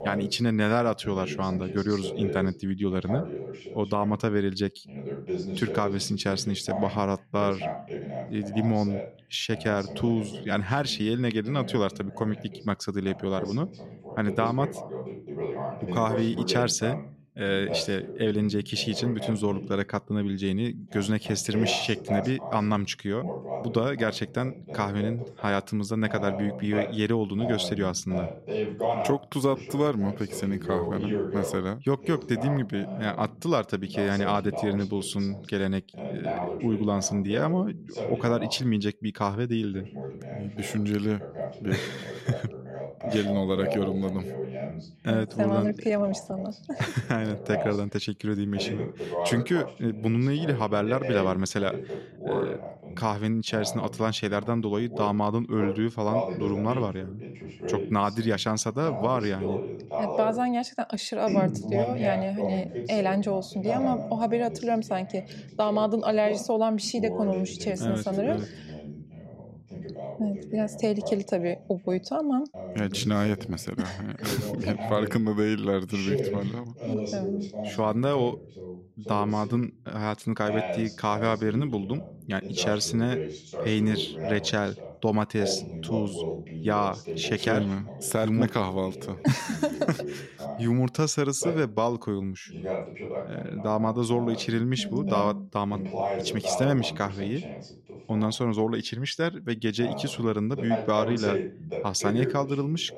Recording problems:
voice in the background; loud; throughout; 7 dB below the speech

